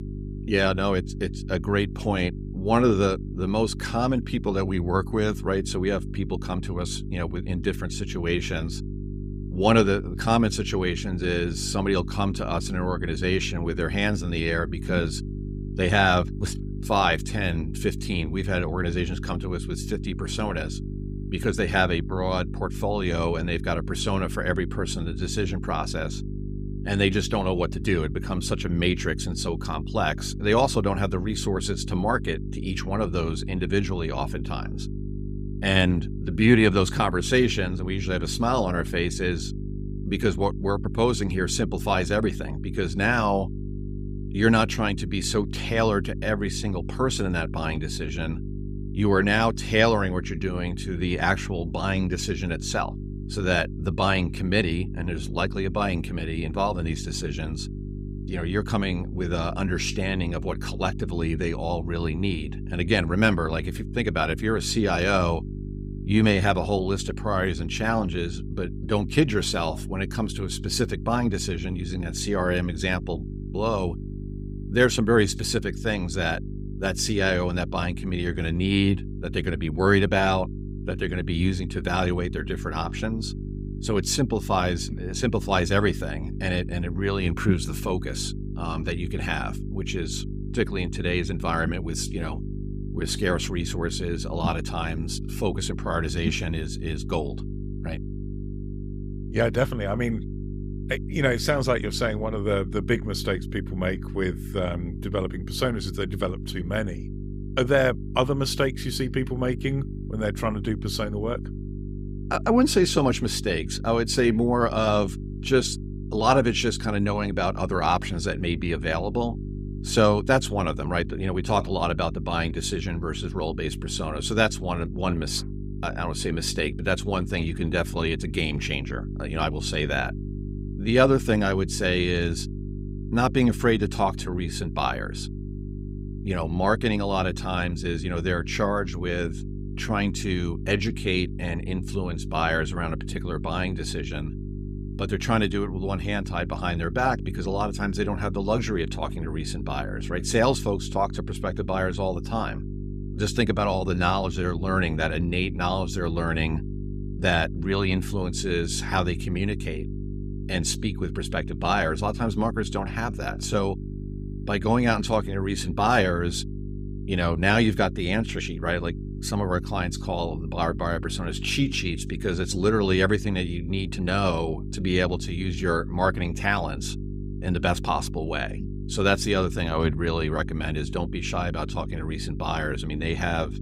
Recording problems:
electrical hum; noticeable; throughout; 50 Hz, 15 dB below the speech

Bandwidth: 15.5 kHz